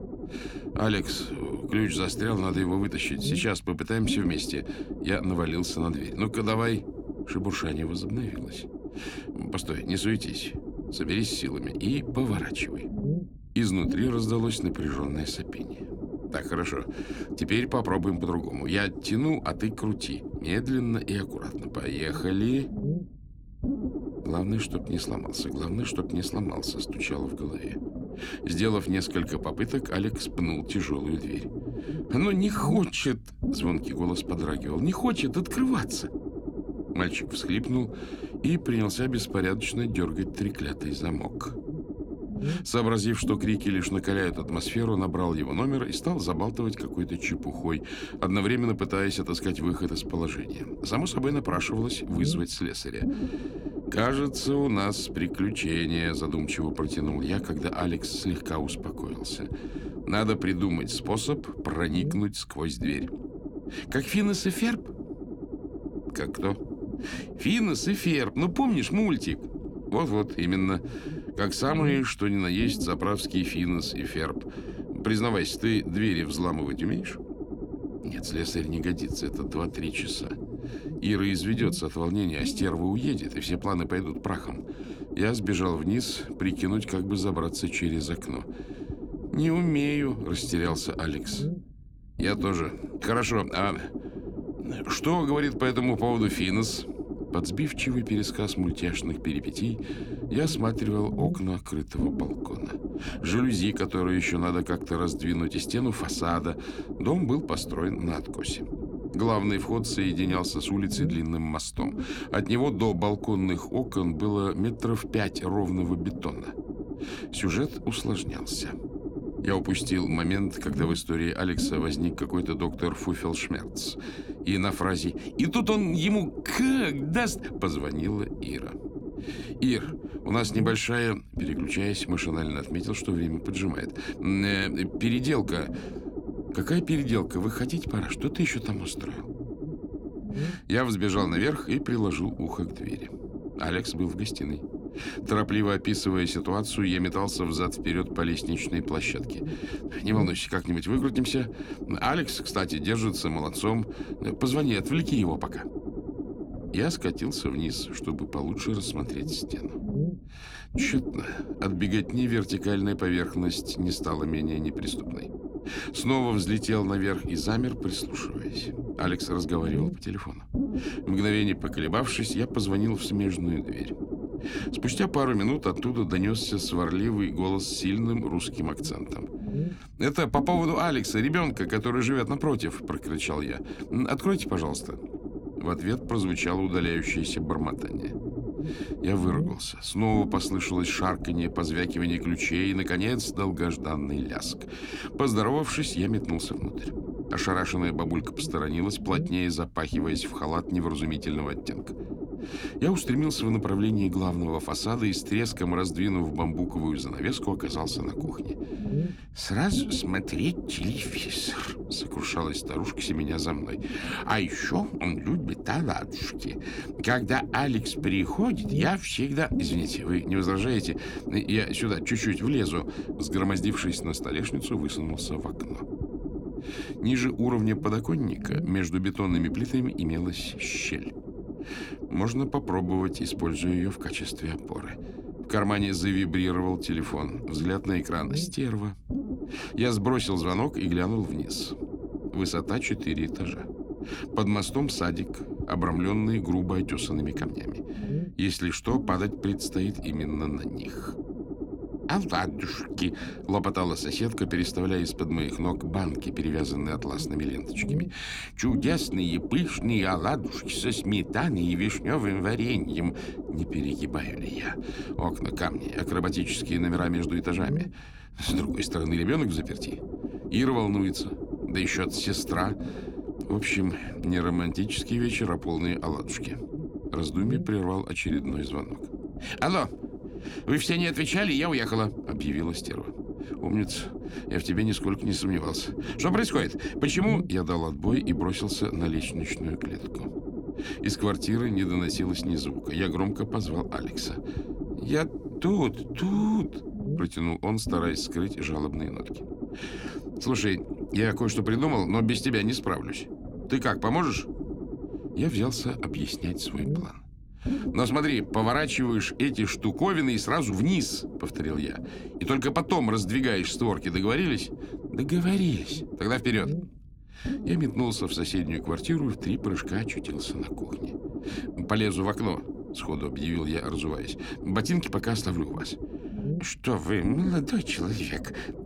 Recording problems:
low rumble; loud; throughout; 9 dB below the speech

